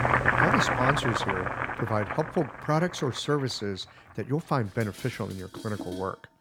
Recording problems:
household noises; very loud; throughout; 3 dB above the speech

